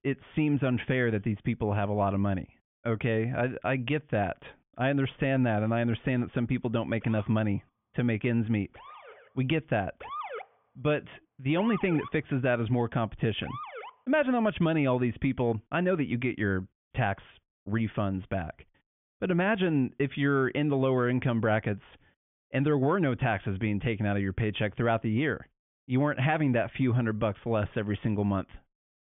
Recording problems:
high frequencies cut off; severe; nothing above 3.5 kHz
siren; noticeable; from 7 to 14 s; peak 8 dB below the speech

